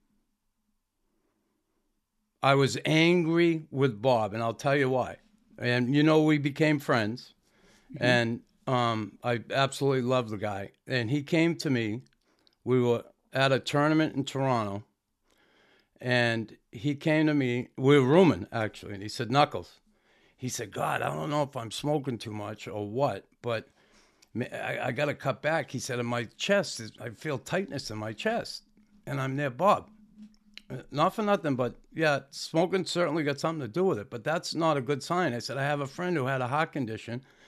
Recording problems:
none

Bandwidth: 13.5 kHz